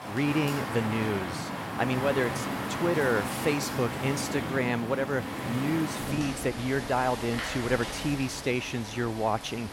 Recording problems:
rain or running water; loud; throughout; 4 dB below the speech

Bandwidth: 16 kHz